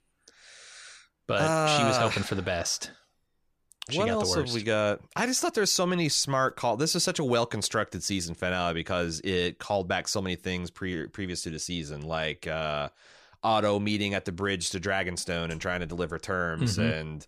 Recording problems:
none

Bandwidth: 15 kHz